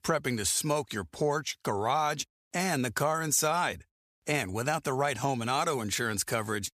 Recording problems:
none

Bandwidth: 14.5 kHz